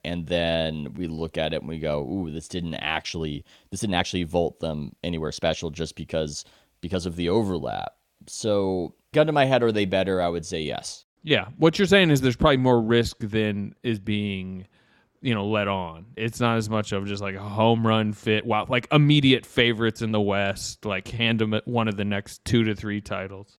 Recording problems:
uneven, jittery; strongly; from 1 to 23 s

